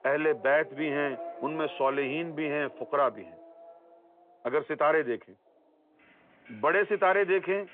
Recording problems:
phone-call audio
traffic noise; noticeable; throughout; 20 dB below the speech

